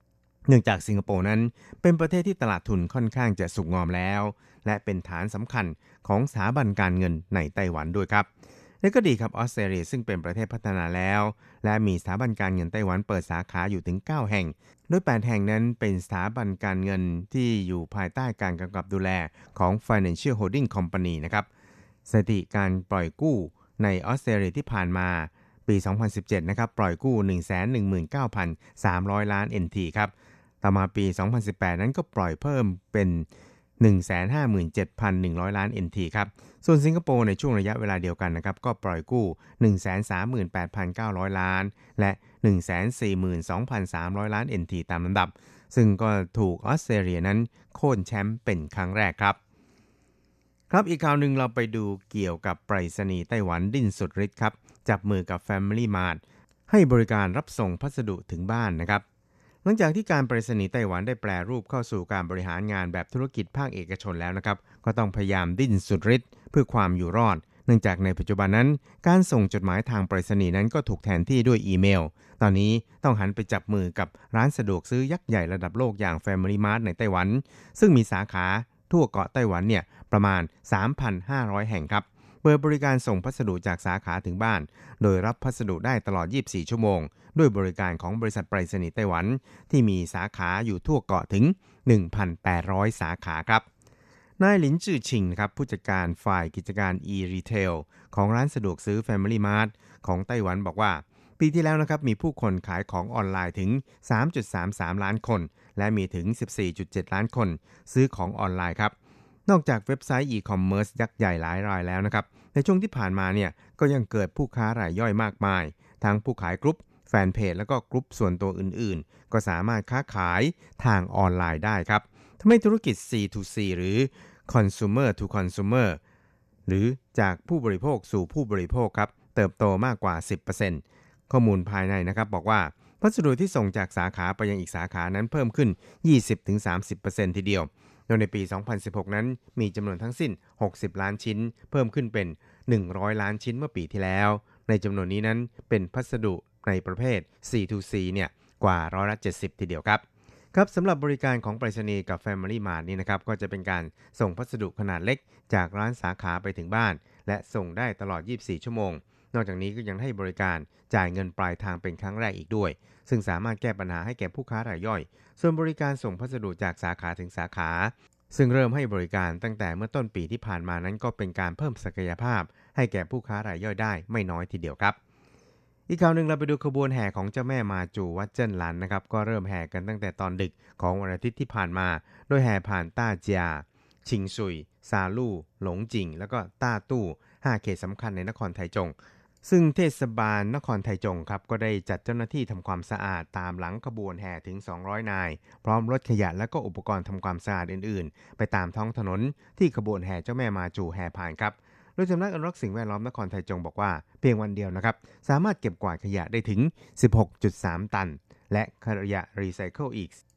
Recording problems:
none

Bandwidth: 13.5 kHz